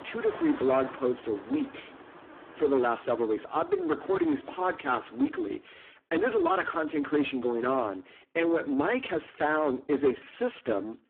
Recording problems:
phone-call audio; poor line
distortion; slight; 10 dB below the speech
traffic noise; noticeable; until 5.5 s; 20 dB below the speech

